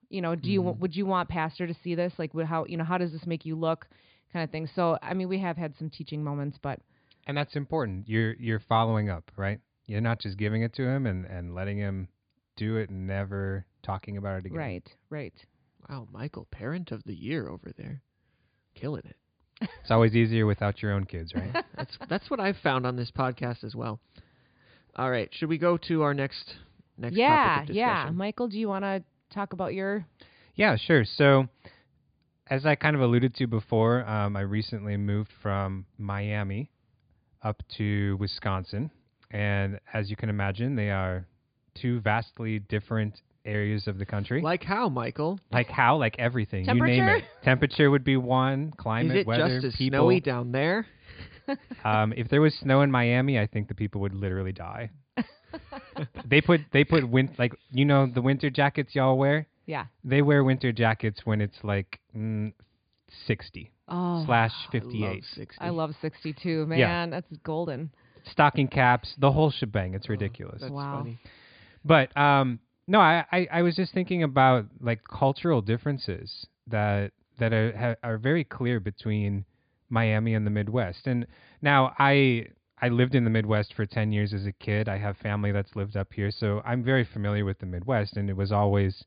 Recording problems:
high frequencies cut off; severe; nothing above 5 kHz

